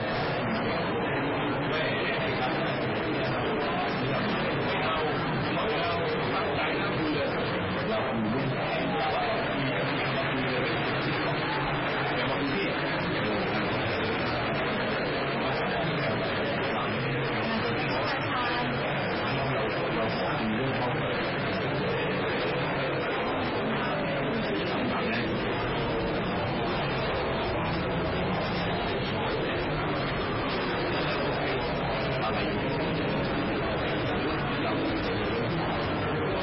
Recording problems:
distortion; heavy; 6 dB below the speech
garbled, watery; badly; nothing above 5.5 kHz
room echo; slight; dies away in 0.3 s
off-mic speech; somewhat distant
murmuring crowd; very loud; throughout; 2 dB above the speech

